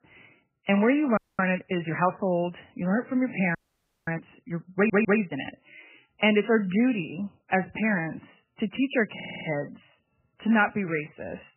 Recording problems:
garbled, watery; badly; nothing above 3 kHz
audio freezing; at 1 s and at 3.5 s for 0.5 s
audio stuttering; at 5 s and at 9 s

